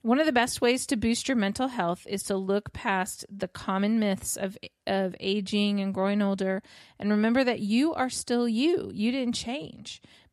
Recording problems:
none

